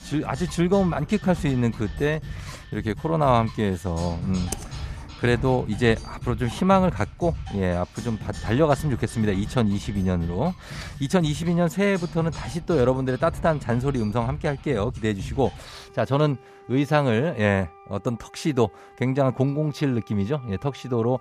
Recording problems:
background music; noticeable; throughout; 15 dB below the speech
keyboard typing; faint; at 4.5 s; peak 10 dB below the speech

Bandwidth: 14.5 kHz